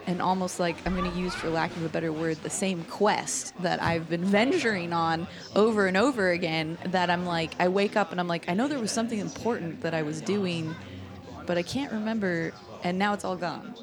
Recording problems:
chatter from many people; noticeable; throughout; 15 dB below the speech

